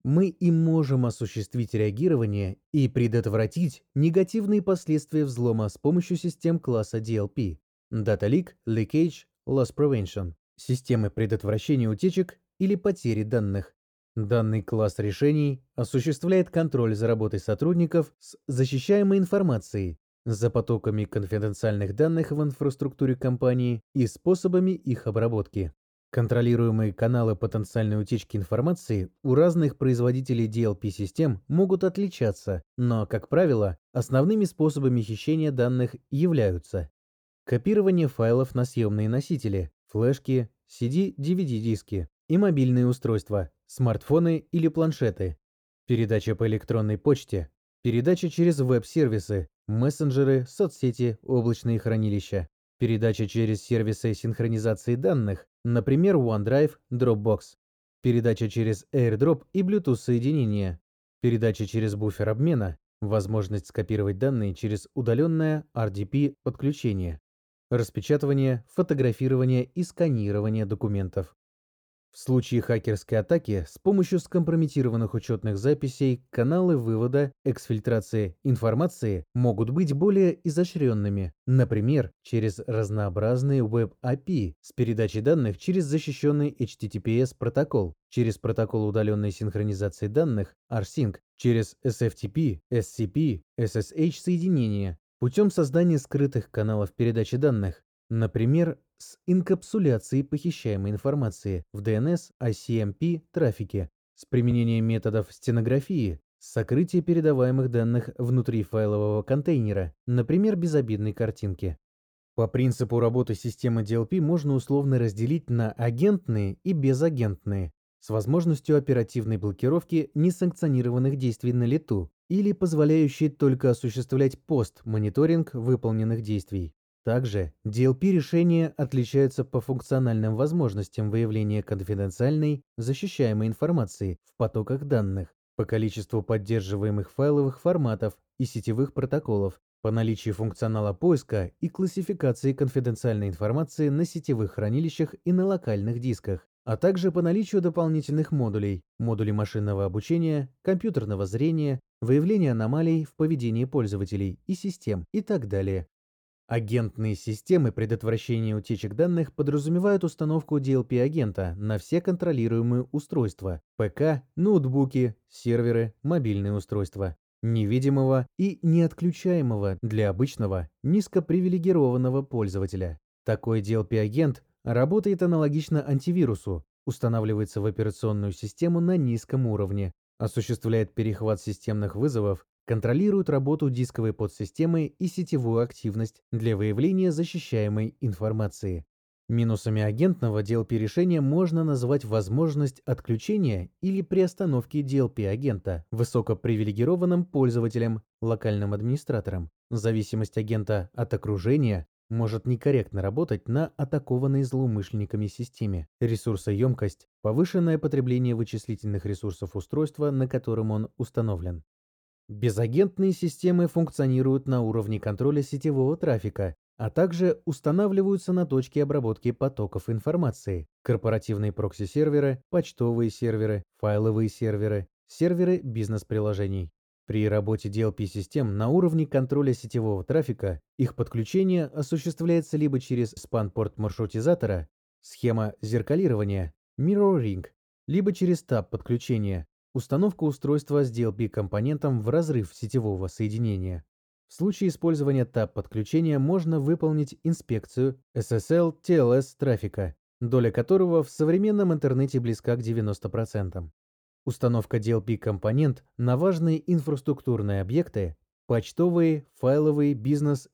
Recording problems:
muffled; slightly; fading above 1.5 kHz

